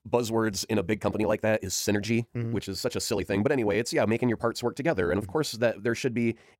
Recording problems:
wrong speed, natural pitch; too fast; 1.5 times normal speed

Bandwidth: 16 kHz